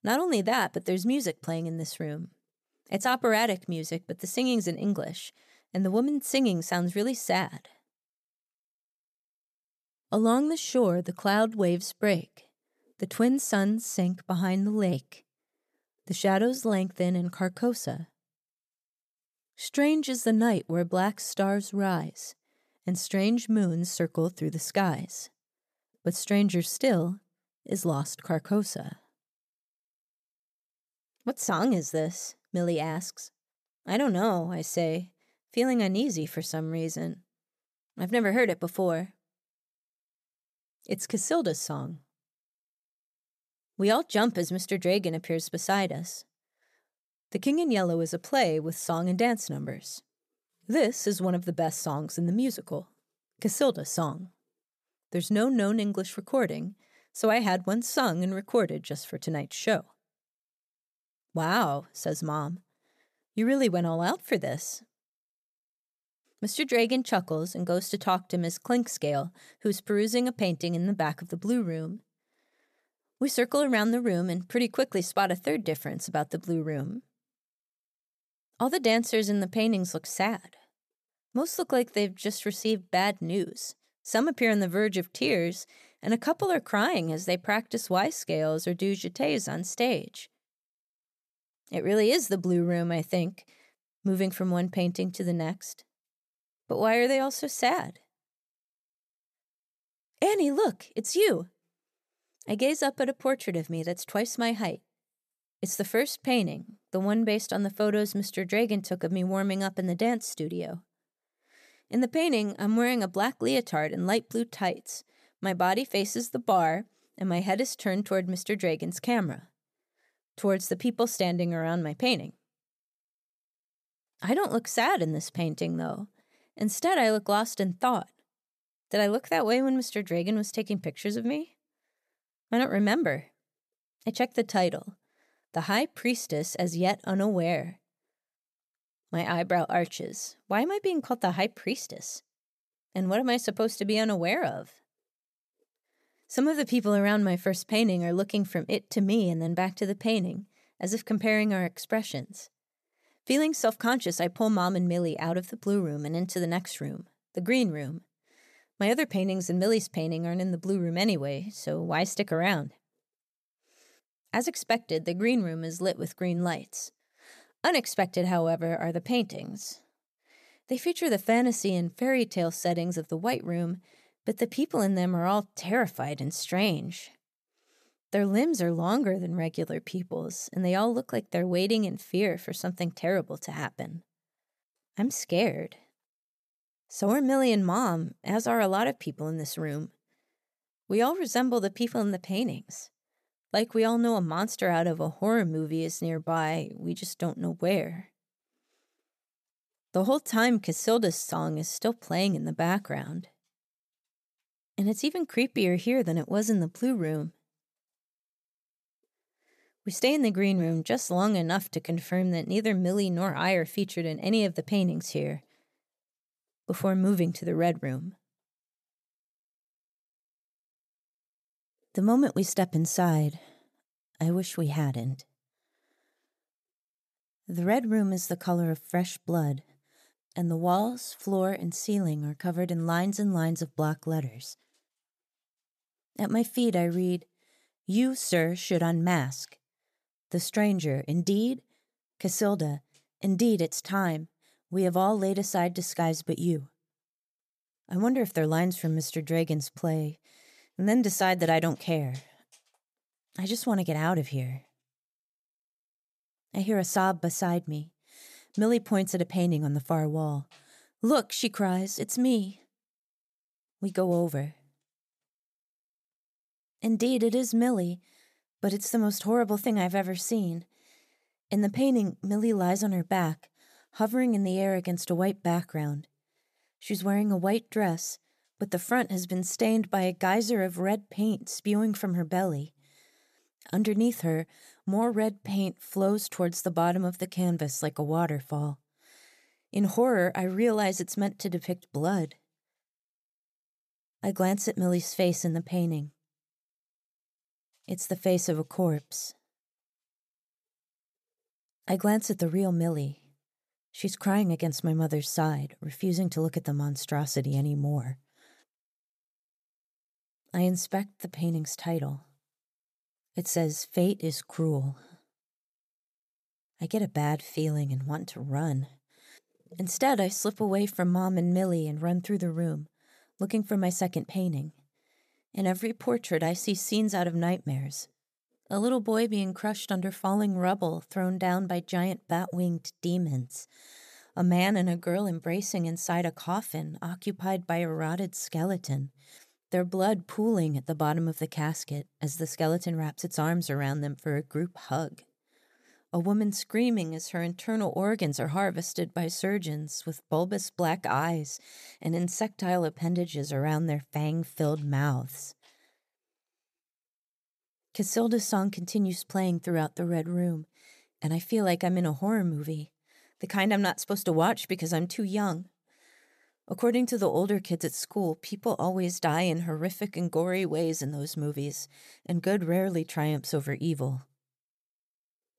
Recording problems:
none

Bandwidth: 14.5 kHz